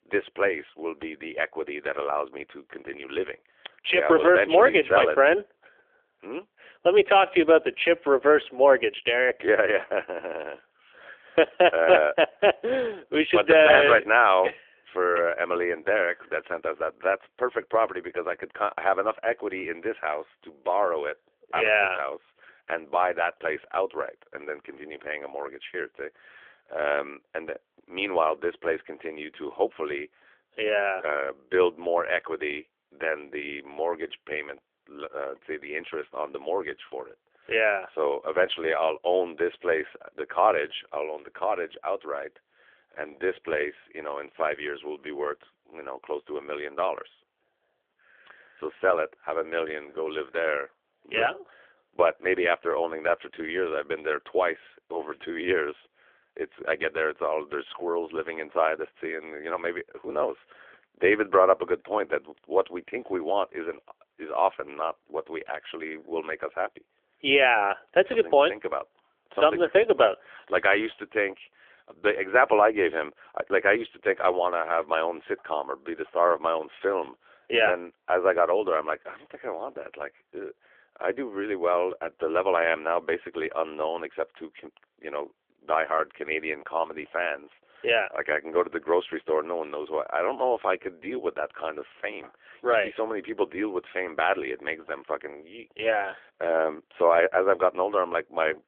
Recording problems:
phone-call audio; nothing above 3.5 kHz

